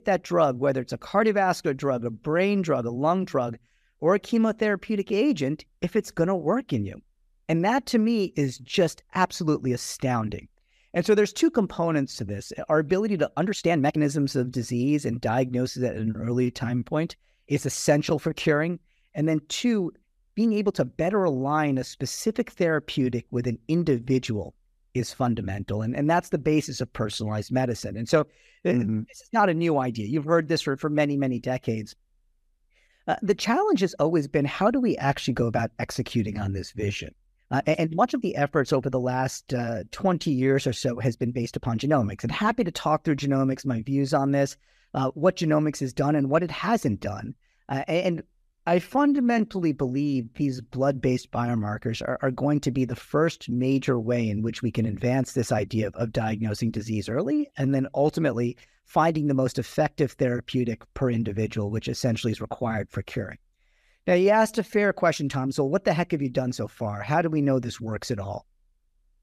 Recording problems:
uneven, jittery; strongly; from 2 s to 1:07

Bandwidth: 14.5 kHz